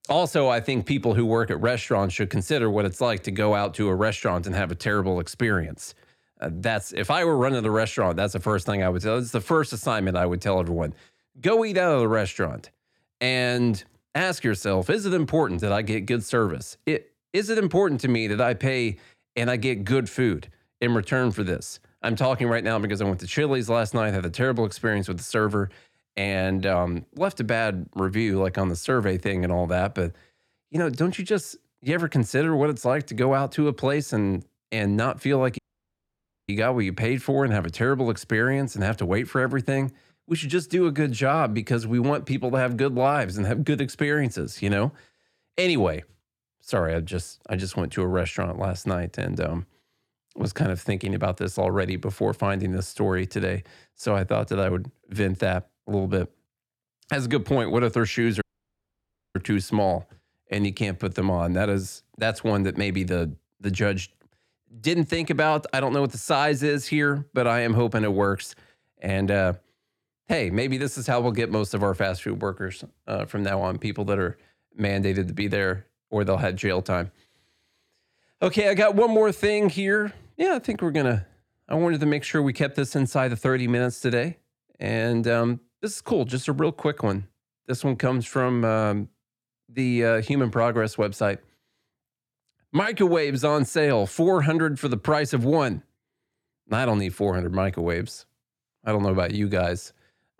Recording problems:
audio cutting out; at 36 s for 1 s and at 58 s for 1 s

